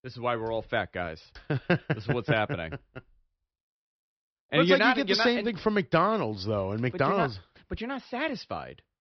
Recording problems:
high frequencies cut off; noticeable; nothing above 5.5 kHz

